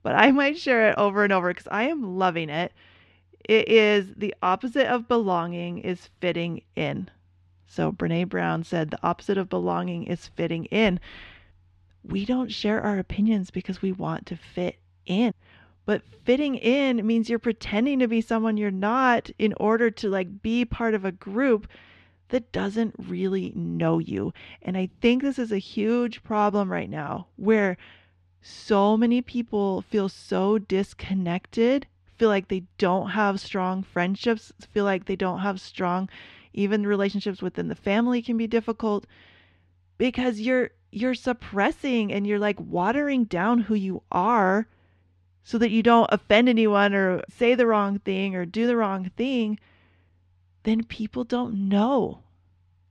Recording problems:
muffled; slightly; fading above 2.5 kHz

